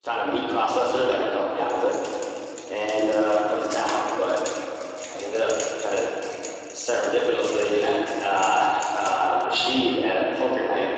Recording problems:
room echo; strong; dies away in 3 s
off-mic speech; far
echo of what is said; noticeable; from 5.5 s on; 150 ms later, 15 dB below the speech
thin; somewhat; fading below 300 Hz
garbled, watery; slightly; nothing above 7.5 kHz
jangling keys; noticeable; from 2 to 9.5 s; peak 9 dB below the speech

